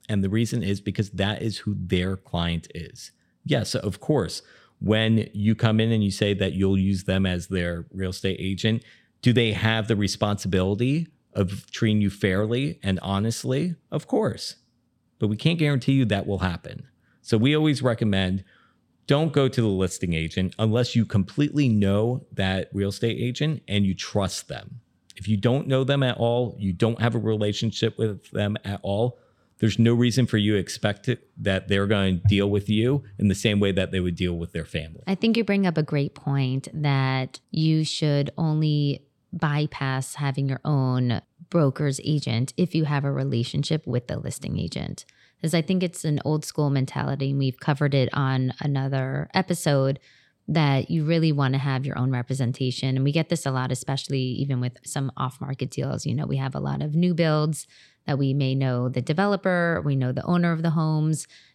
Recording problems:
none

